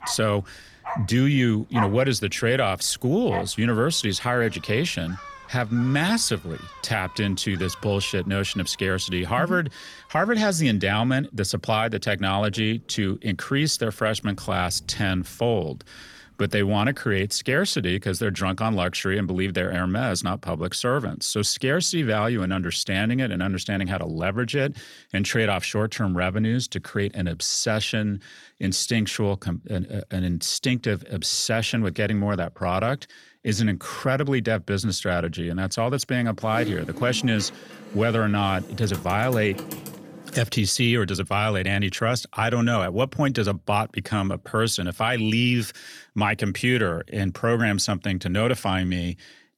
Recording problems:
animal sounds; noticeable; until 18 s; 15 dB below the speech
keyboard typing; noticeable; from 36 to 40 s; peak 8 dB below the speech

